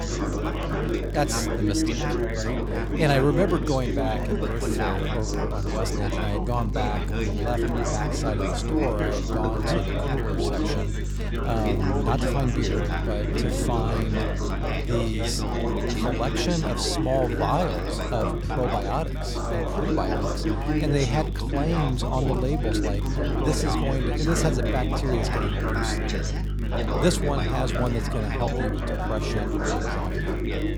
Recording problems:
chatter from many people; loud; throughout; as loud as the speech
electrical hum; noticeable; throughout; 50 Hz, 15 dB below the speech
crackle, like an old record; faint; 25 dB below the speech

